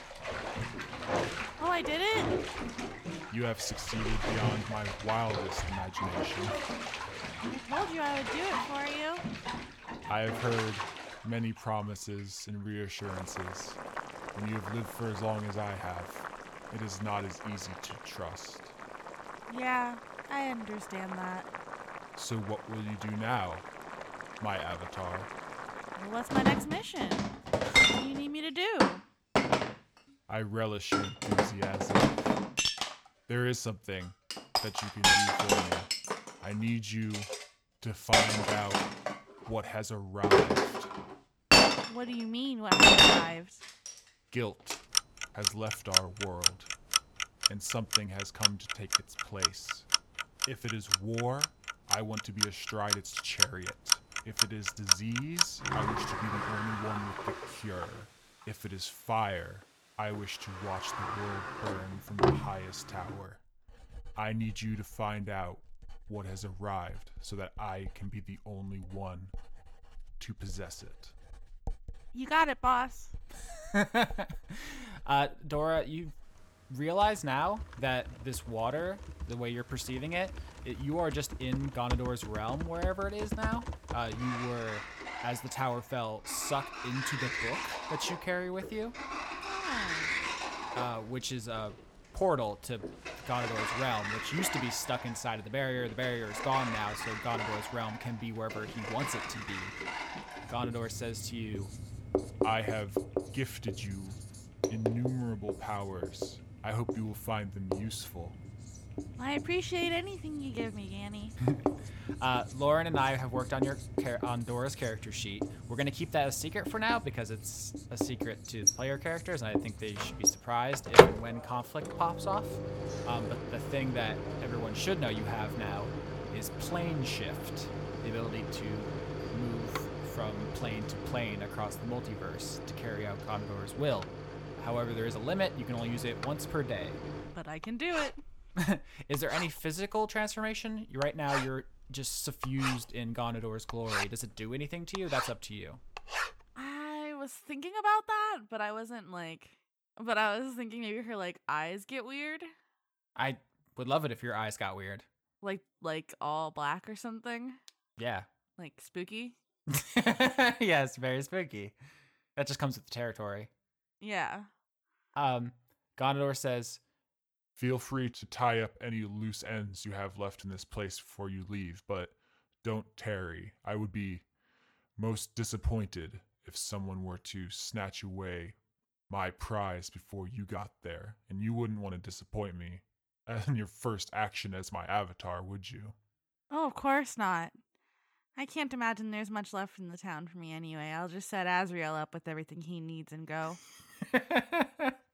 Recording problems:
household noises; very loud; until 2:27; 4 dB above the speech

